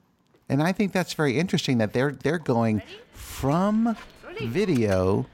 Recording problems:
animal sounds; noticeable; throughout; 20 dB below the speech

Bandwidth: 16 kHz